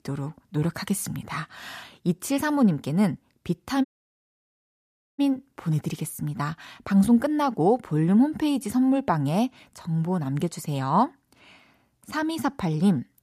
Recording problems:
audio cutting out; at 4 s for 1.5 s

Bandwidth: 14.5 kHz